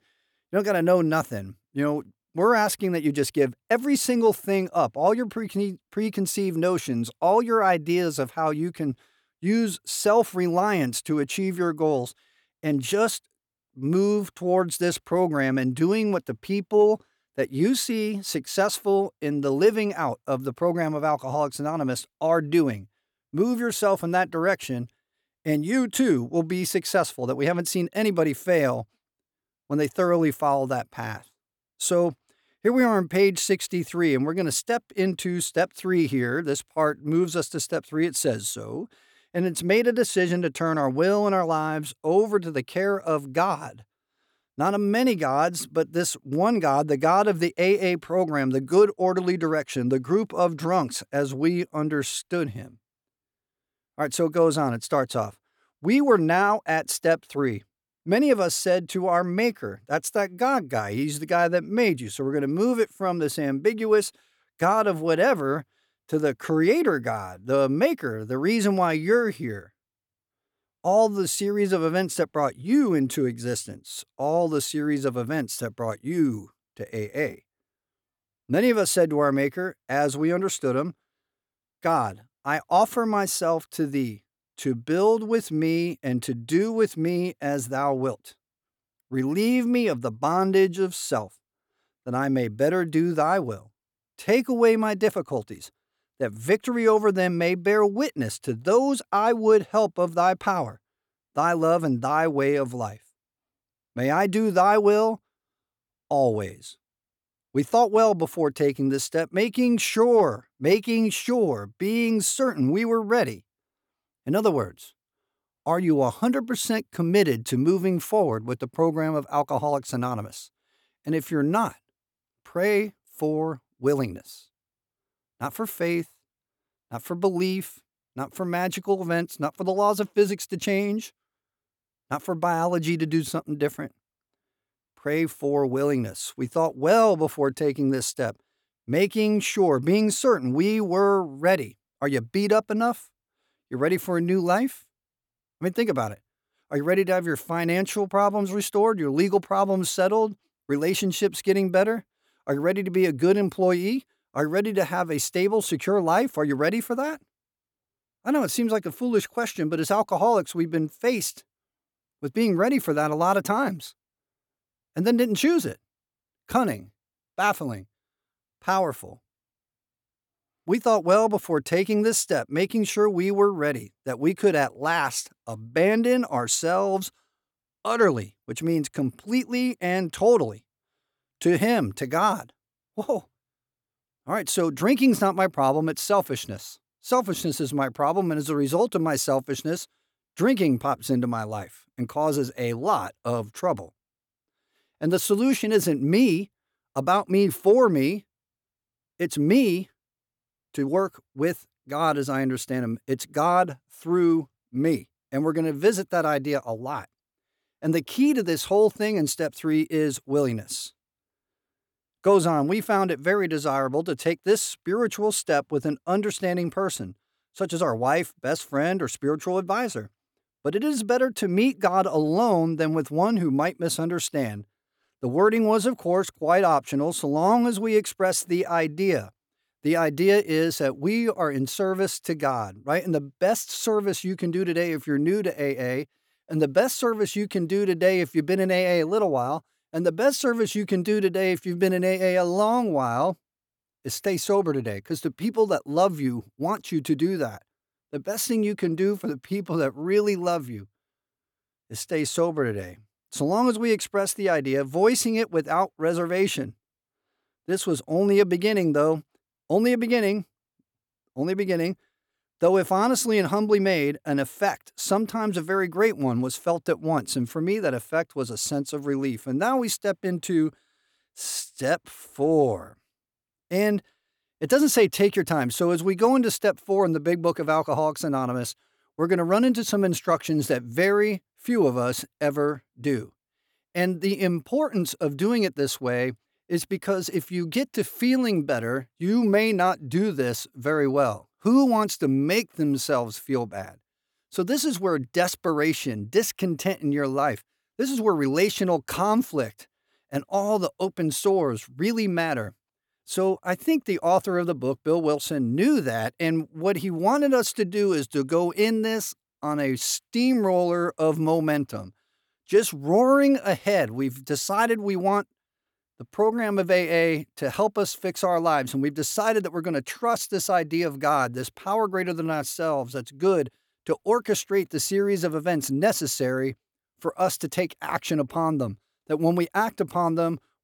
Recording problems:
none

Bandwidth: 18.5 kHz